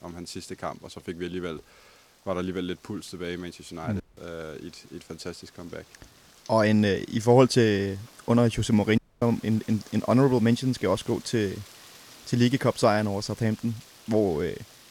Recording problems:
rain or running water; faint; throughout; 25 dB below the speech
audio cutting out; at 4 s and at 9 s

